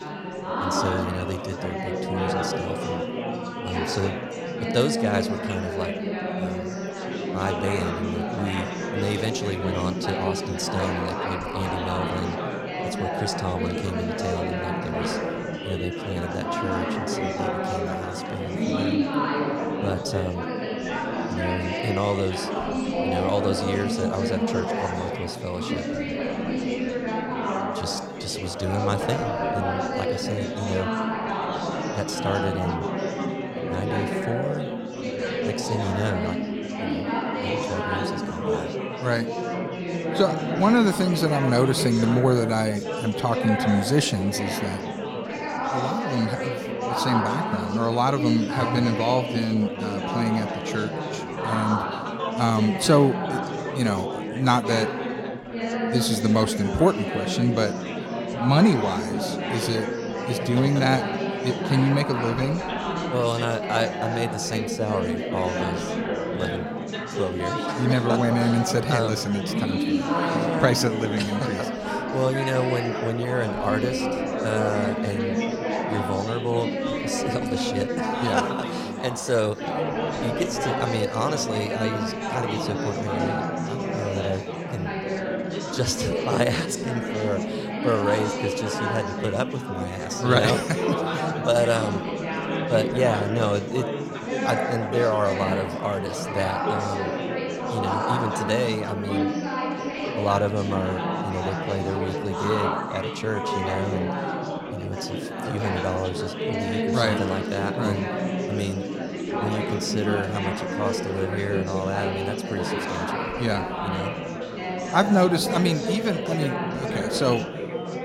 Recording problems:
chatter from many people; loud; throughout; 1 dB below the speech

